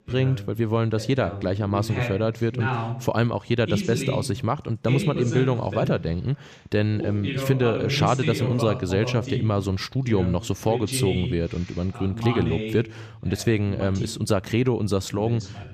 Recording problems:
voice in the background; loud; throughout; 6 dB below the speech

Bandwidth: 14.5 kHz